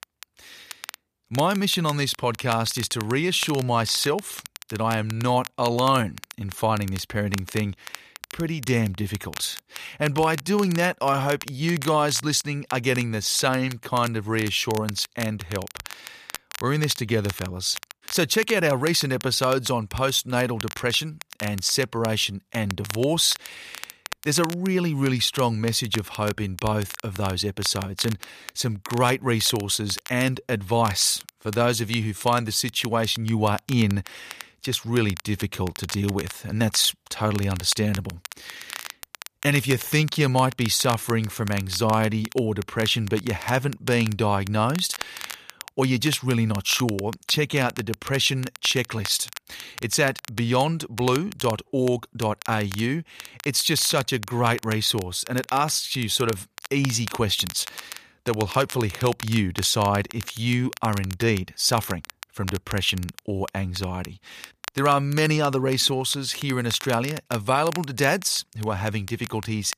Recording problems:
crackle, like an old record; noticeable; 15 dB below the speech

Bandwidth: 14.5 kHz